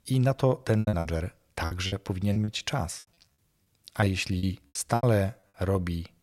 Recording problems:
choppy; very; 13% of the speech affected

